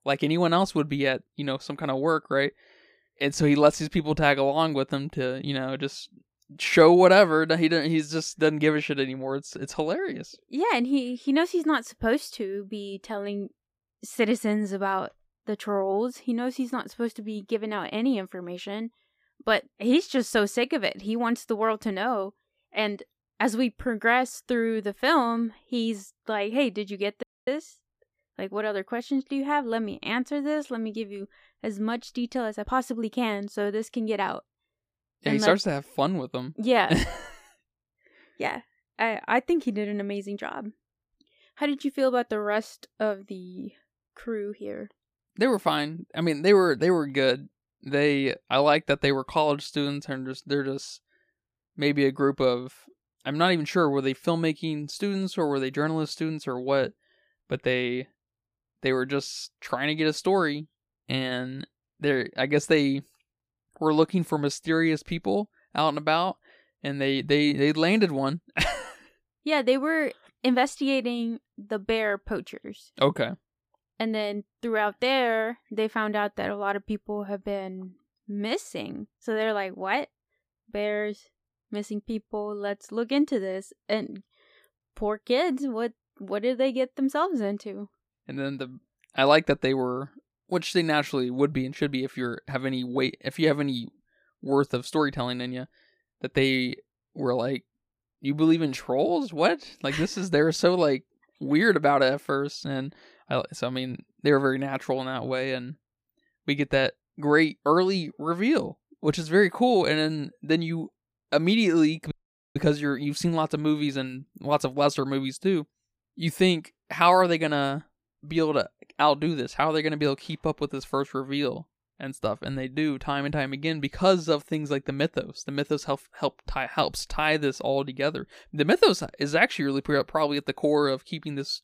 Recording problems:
audio cutting out; at 27 s and at 1:52

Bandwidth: 15 kHz